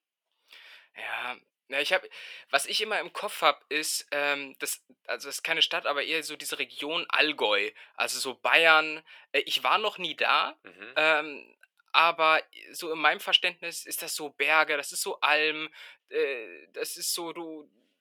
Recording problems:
thin; very; fading below 550 Hz

